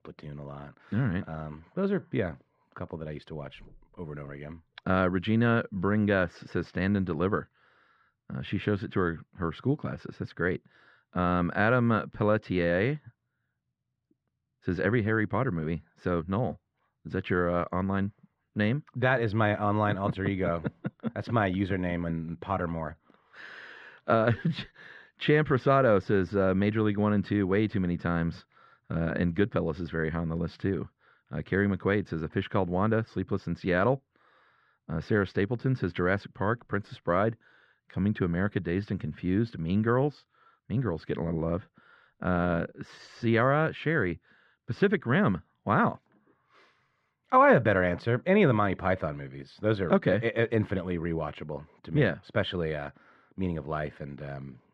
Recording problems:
muffled; slightly; fading above 2 kHz

